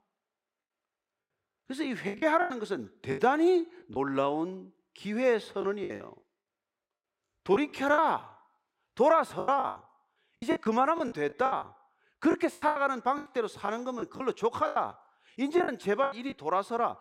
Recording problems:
choppy; very; 14% of the speech affected

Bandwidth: 16 kHz